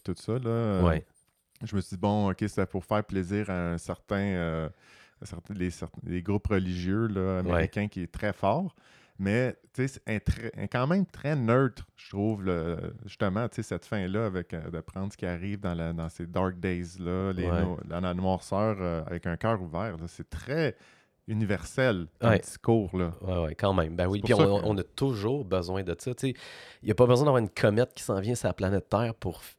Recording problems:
none

